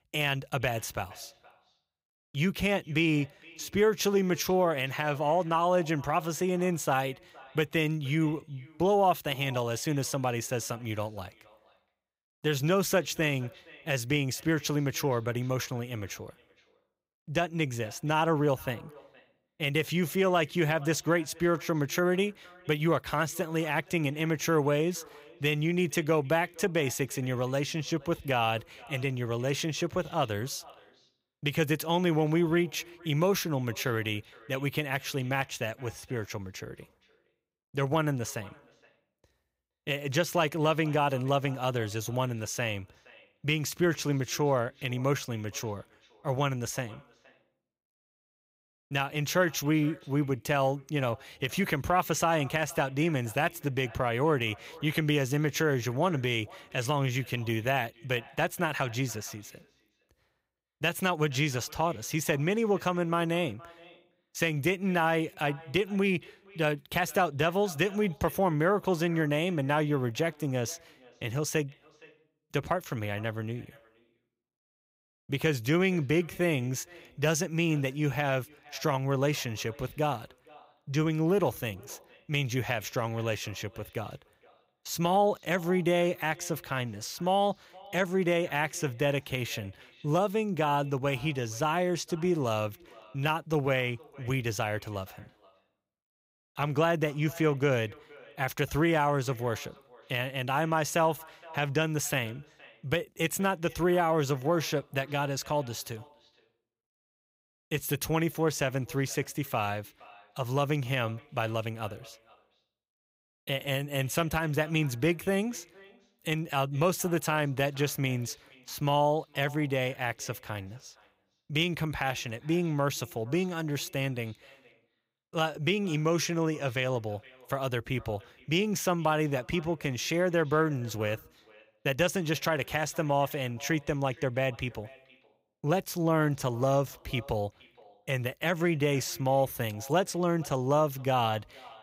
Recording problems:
echo of what is said; faint; throughout; 470 ms later, 25 dB below the speech

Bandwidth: 15.5 kHz